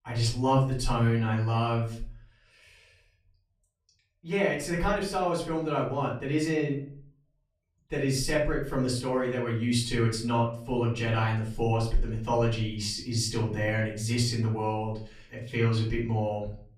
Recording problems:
off-mic speech; far
room echo; slight; dies away in 0.4 s

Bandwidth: 14.5 kHz